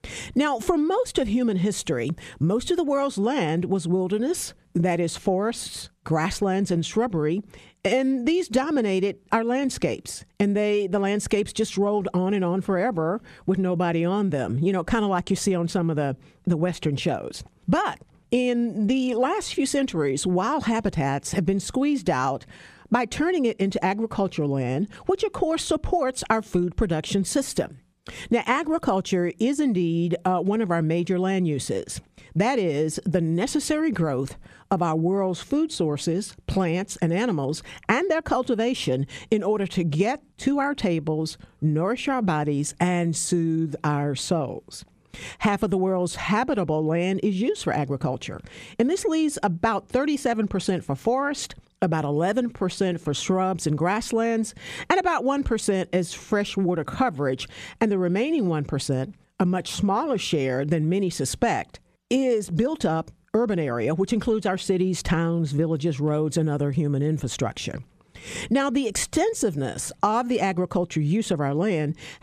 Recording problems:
squashed, flat; somewhat

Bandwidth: 14.5 kHz